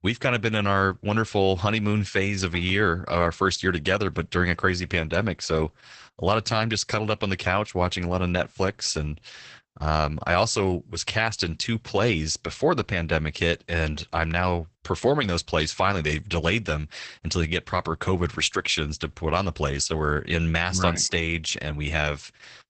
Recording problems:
garbled, watery; badly; nothing above 8 kHz

